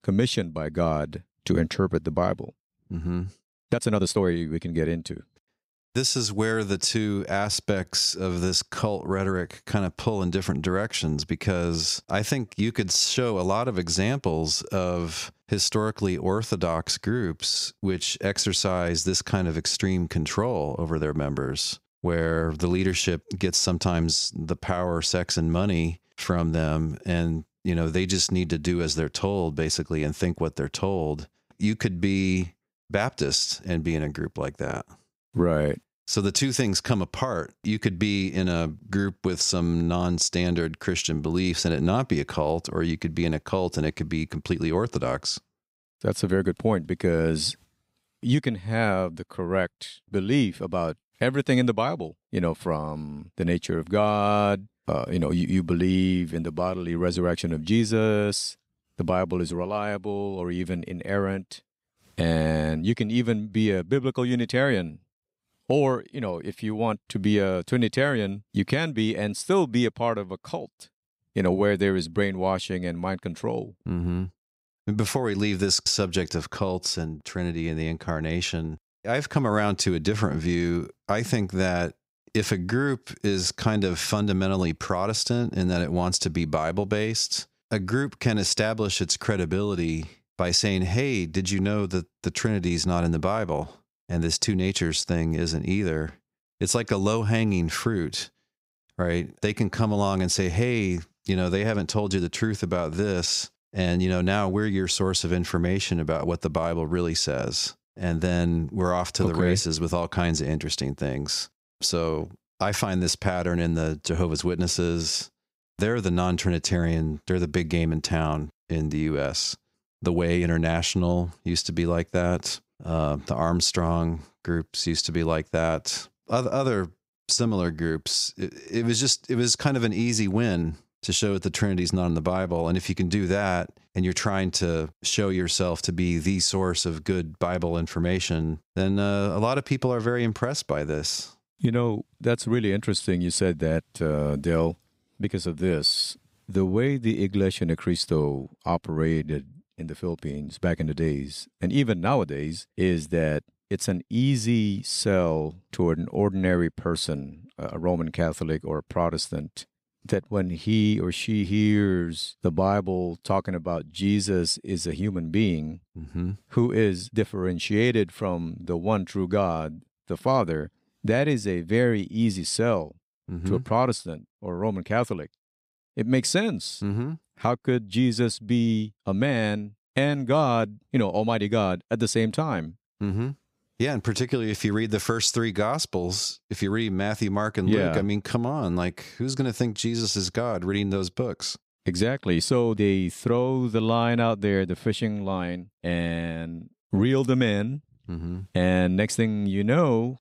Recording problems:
uneven, jittery; strongly; from 3.5 s to 3:16

